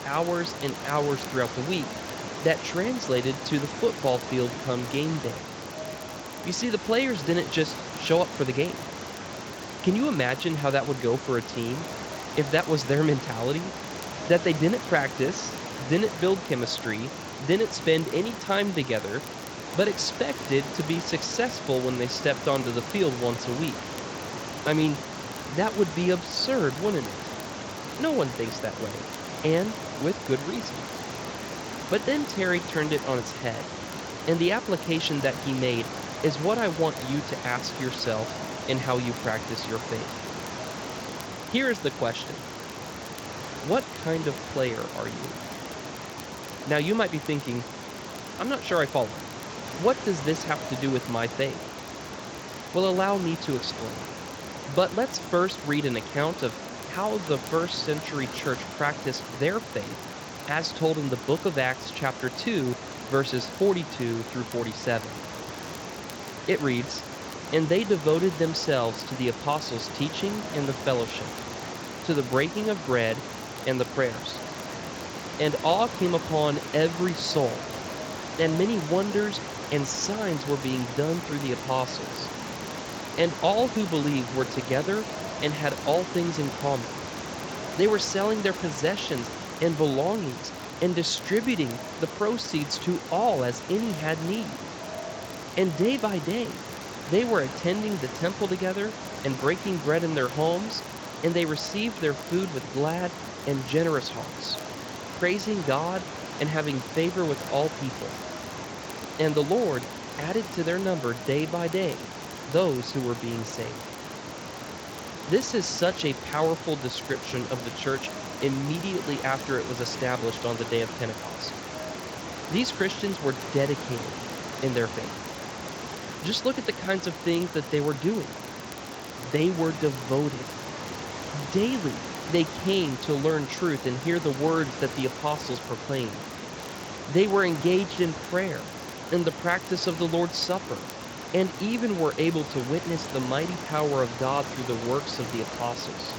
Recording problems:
echo of what is said; faint; throughout; 540 ms later, 25 dB below the speech
garbled, watery; slightly; nothing above 7.5 kHz
hiss; loud; throughout; 8 dB below the speech
crackle, like an old record; faint; 25 dB below the speech

